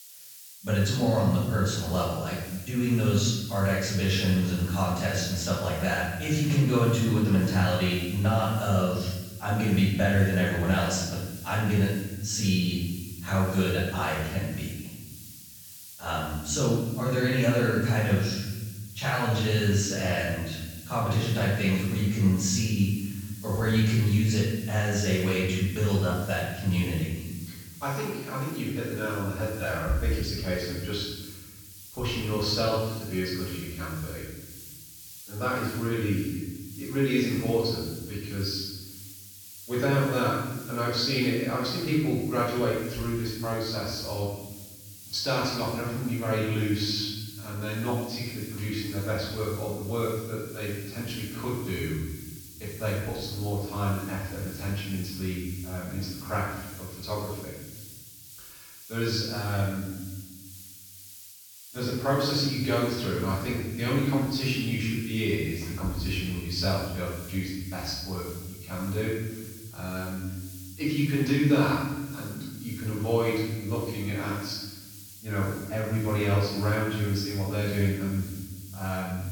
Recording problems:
off-mic speech; far
room echo; noticeable; dies away in 1.2 s
high frequencies cut off; noticeable; nothing above 8 kHz
hiss; noticeable; throughout; 15 dB below the speech

